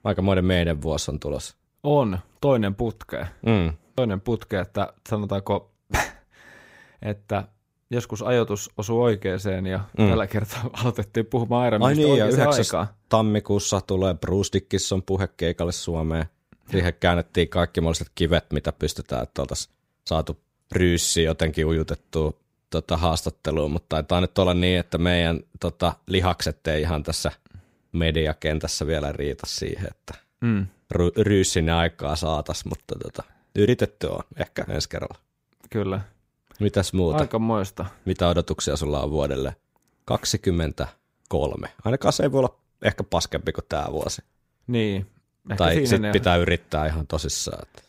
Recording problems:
none

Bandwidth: 15.5 kHz